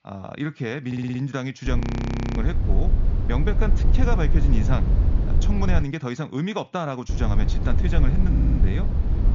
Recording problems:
high frequencies cut off; noticeable; nothing above 7 kHz
low rumble; loud; from 1.5 to 6 s and from 7 s on; 6 dB below the speech
audio stuttering; at 1 s and at 8.5 s
audio freezing; at 2 s for 0.5 s

